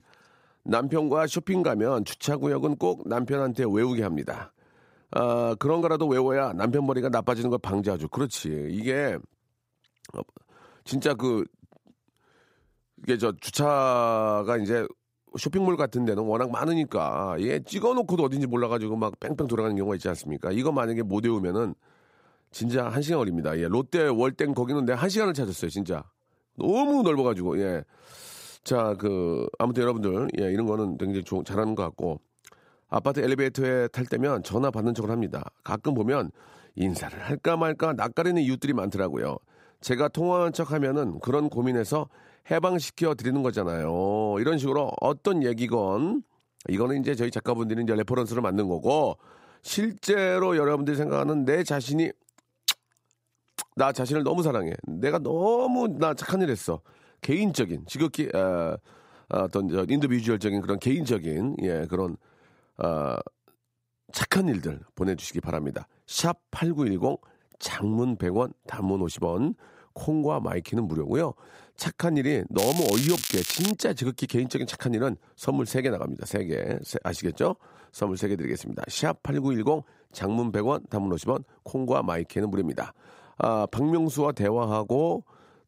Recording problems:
crackling; loud; from 1:13 to 1:14; 3 dB below the speech

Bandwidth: 15.5 kHz